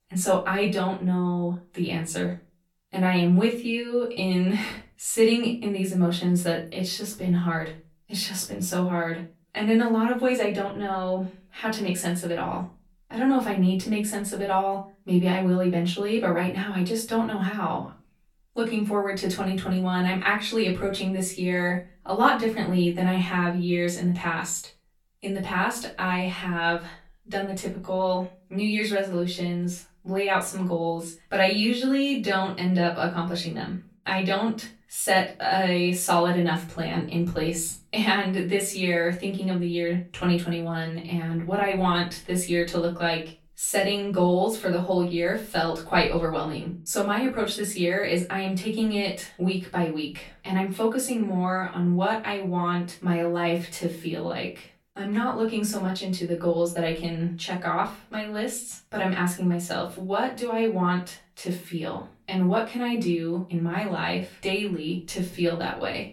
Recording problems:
off-mic speech; far
room echo; slight; dies away in 0.3 s

